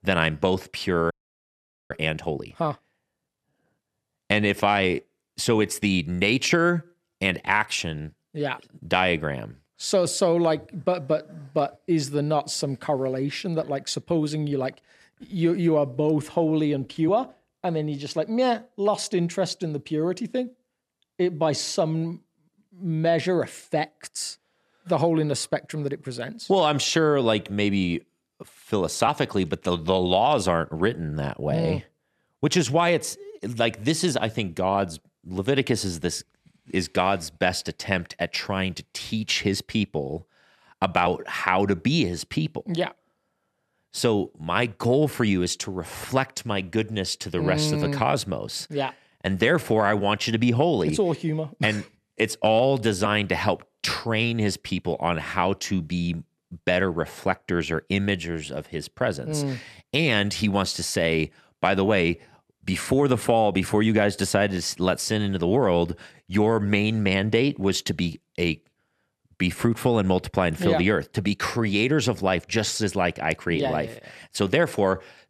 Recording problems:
audio freezing; at 1 s for 1 s

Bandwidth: 13.5 kHz